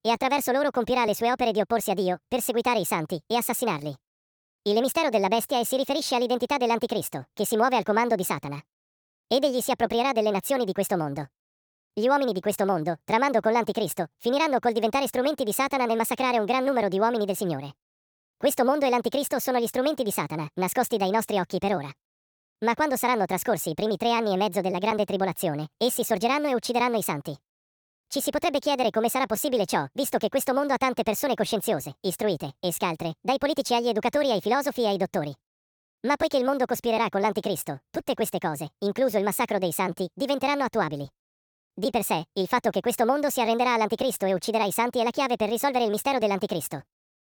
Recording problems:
wrong speed and pitch; too fast and too high; 1.5 times normal speed

